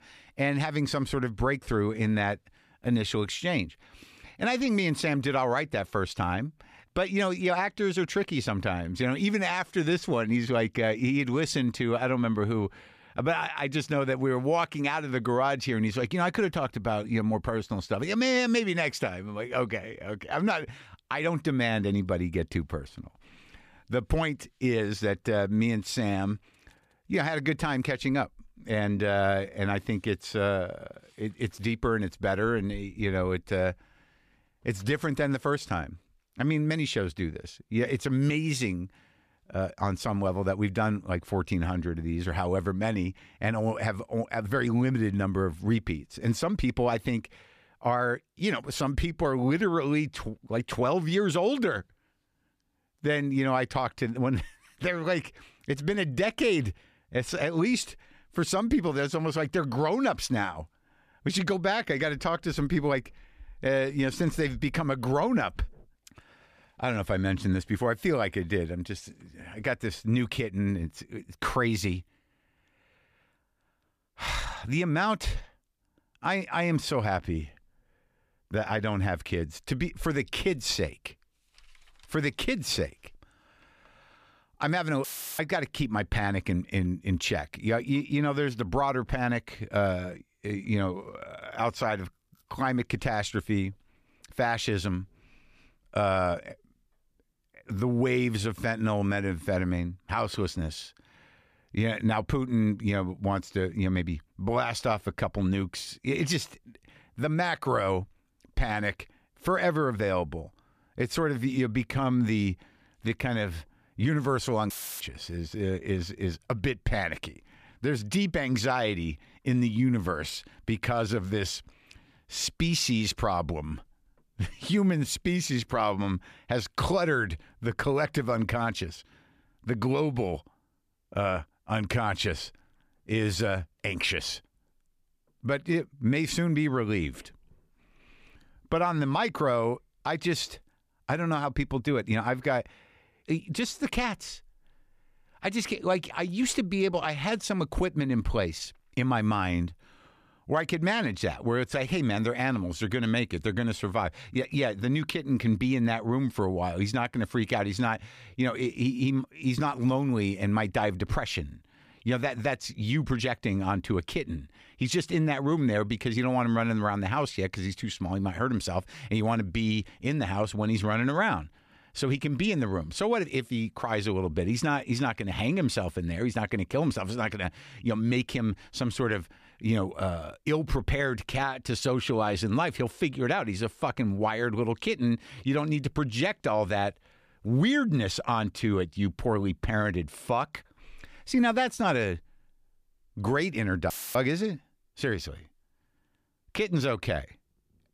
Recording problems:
audio cutting out; filled with static; at 1:25, at 1:55 and at 3:14

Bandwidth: 14.5 kHz